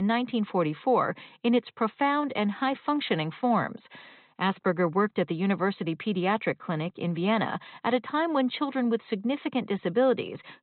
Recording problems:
high frequencies cut off; severe; nothing above 4 kHz
abrupt cut into speech; at the start

